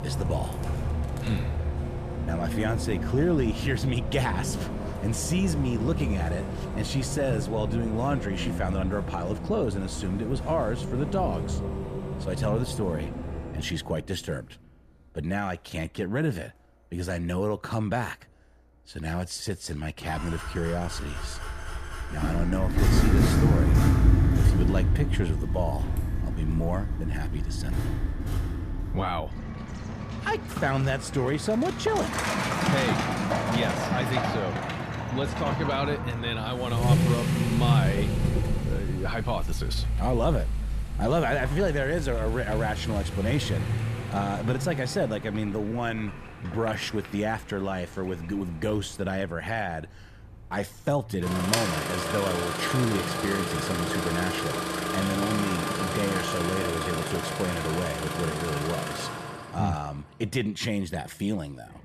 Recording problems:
traffic noise; very loud; throughout; 1 dB above the speech

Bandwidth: 14.5 kHz